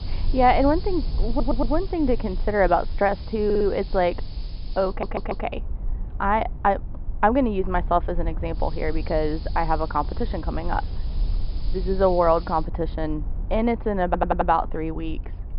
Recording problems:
high frequencies cut off; noticeable; nothing above 5.5 kHz
muffled; very slightly; fading above 4 kHz
hiss; faint; until 5.5 s and from 8.5 to 13 s; 25 dB below the speech
low rumble; faint; throughout; 25 dB below the speech
audio stuttering; 4 times, first at 1.5 s

